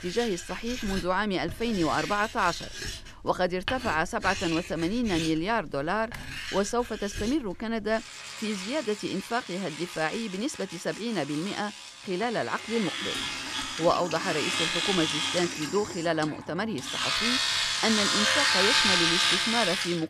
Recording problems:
household noises; very loud; throughout; 2 dB above the speech
keyboard typing; faint; at 6 s and at 13 s; peak 15 dB below the speech

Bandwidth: 14.5 kHz